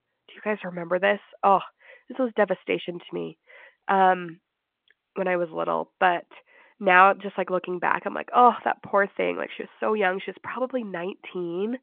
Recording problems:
phone-call audio

